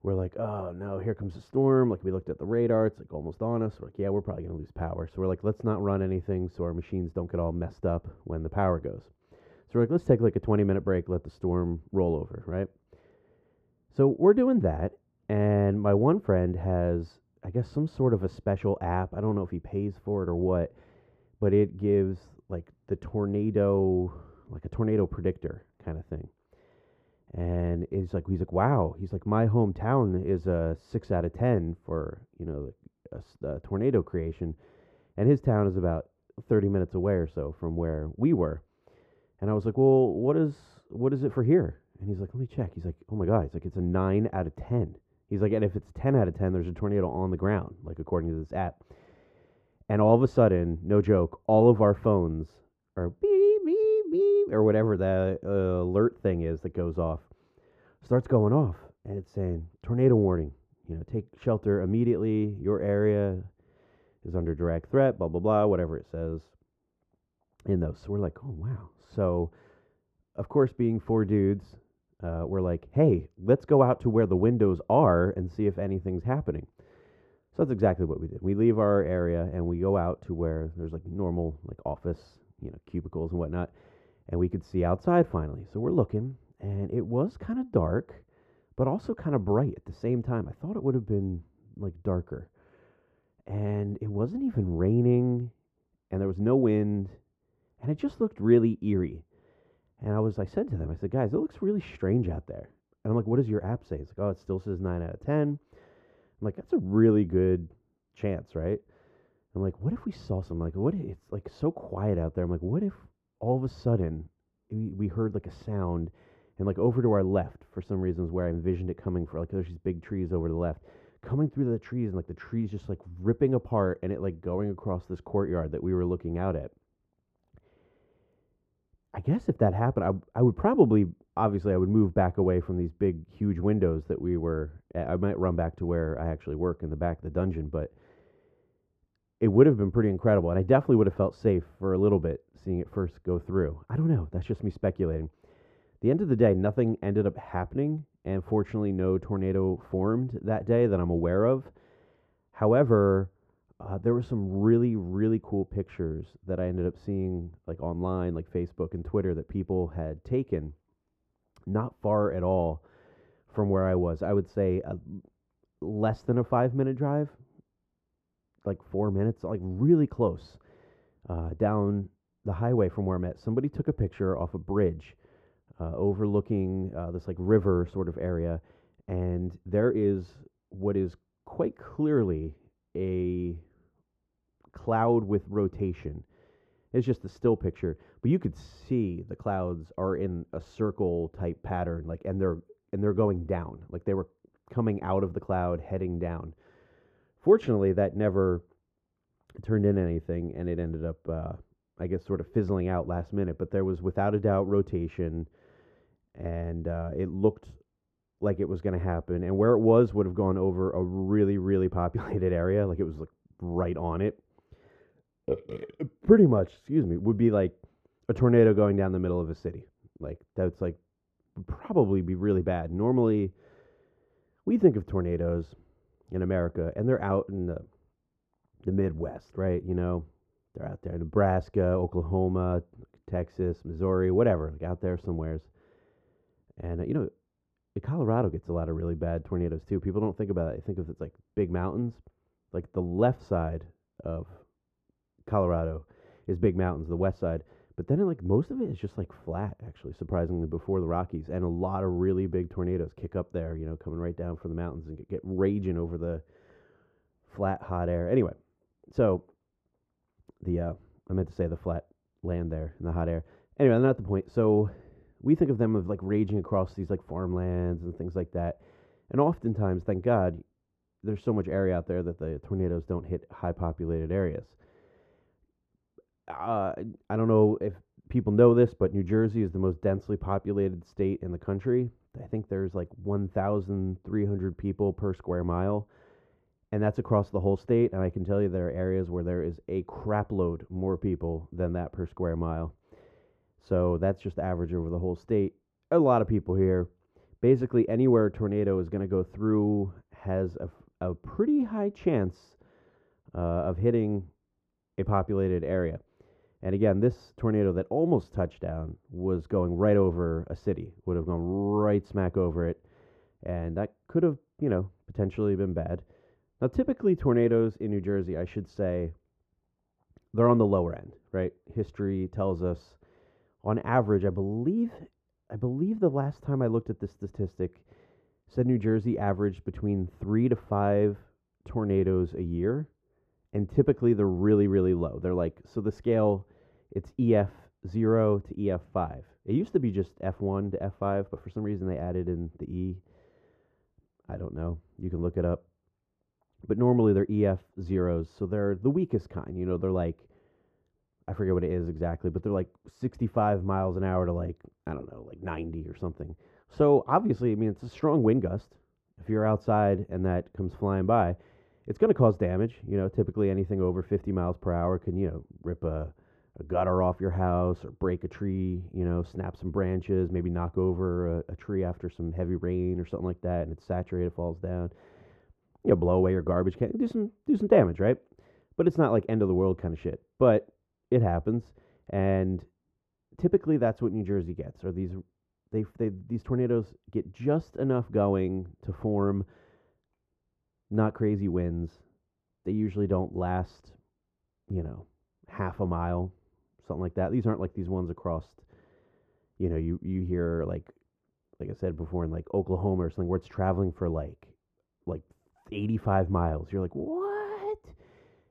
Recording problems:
muffled; very; fading above 2 kHz

